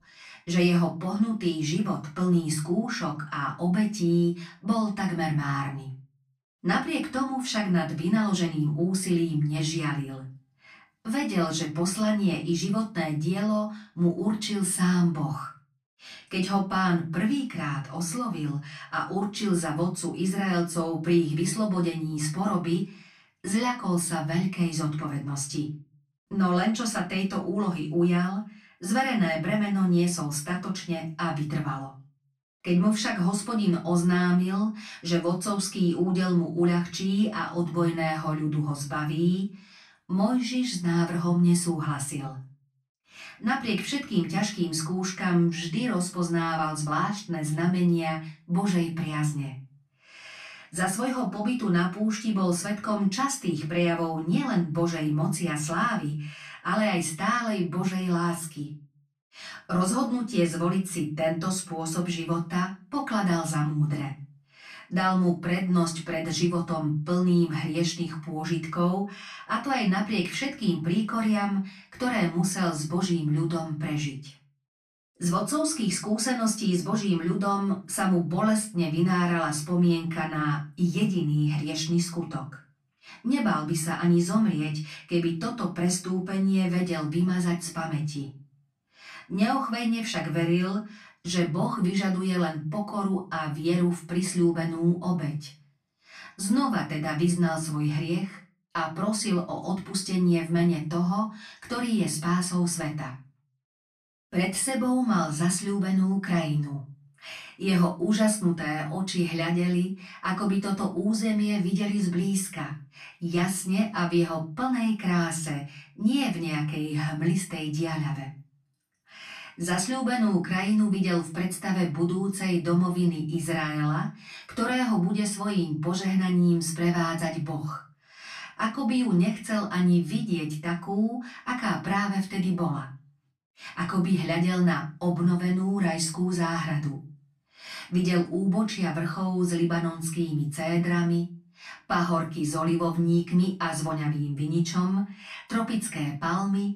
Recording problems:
off-mic speech; far
room echo; slight; dies away in 0.3 s

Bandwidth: 14.5 kHz